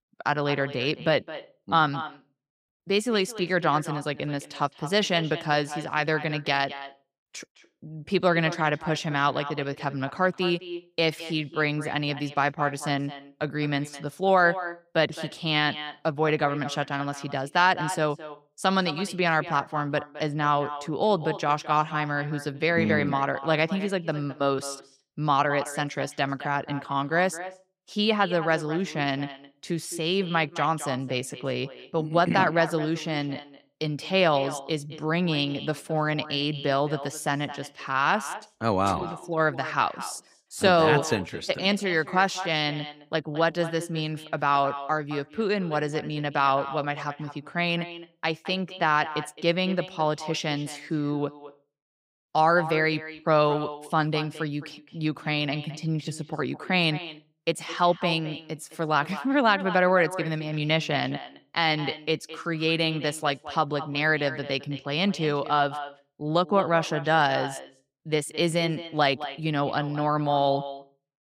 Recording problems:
echo of what is said; noticeable; throughout; 210 ms later, 15 dB below the speech

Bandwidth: 15.5 kHz